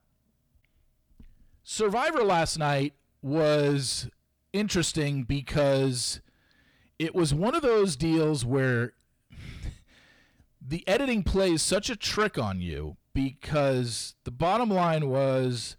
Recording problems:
distortion; slight; 10 dB below the speech

